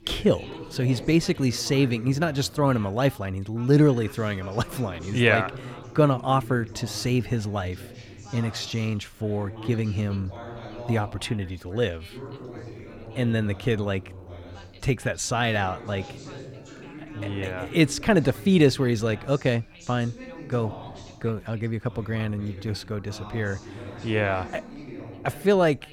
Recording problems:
background chatter; noticeable; throughout; 2 voices, 15 dB below the speech

